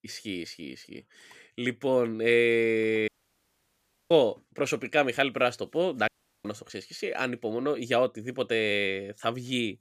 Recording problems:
audio cutting out; at 3 s for 1 s and at 6 s

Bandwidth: 15 kHz